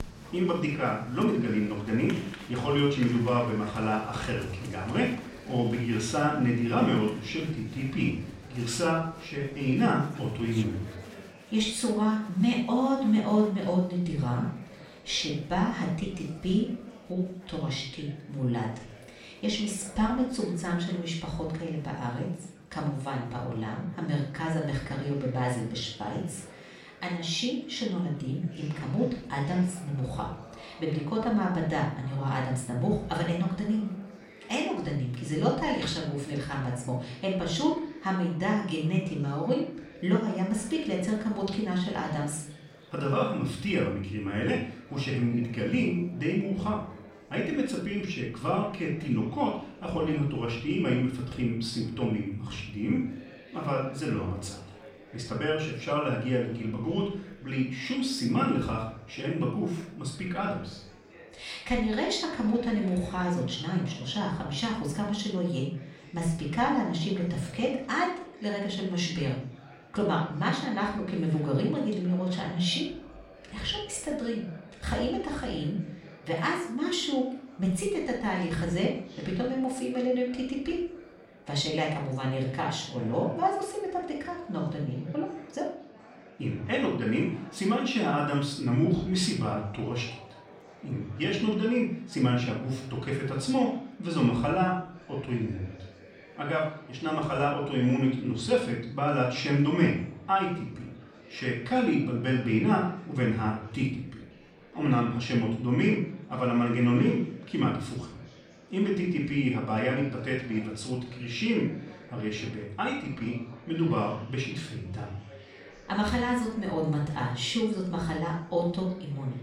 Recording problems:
off-mic speech; far
room echo; noticeable; dies away in 0.5 s
murmuring crowd; faint; throughout; 20 dB below the speech

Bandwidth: 16 kHz